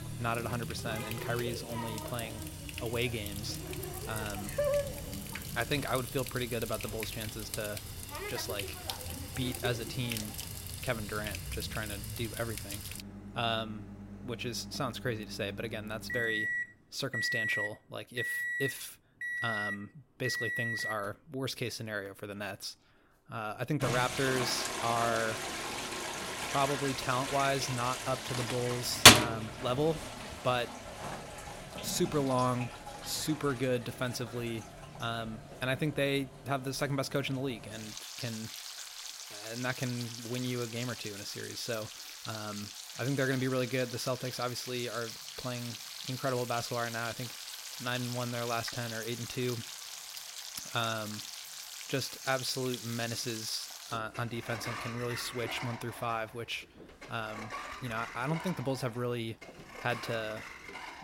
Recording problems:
household noises; very loud; throughout; 1 dB above the speech

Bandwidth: 16 kHz